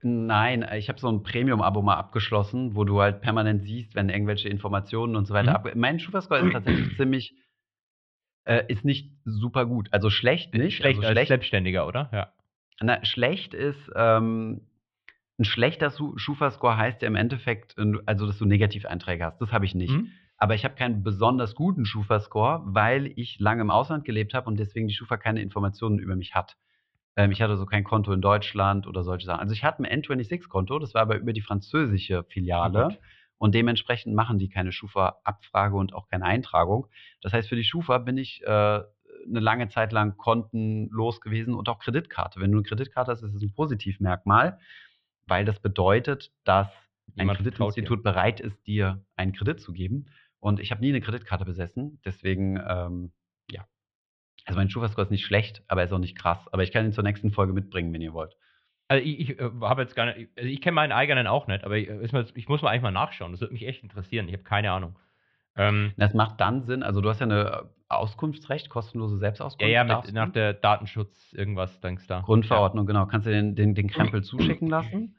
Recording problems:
muffled; very; fading above 3.5 kHz

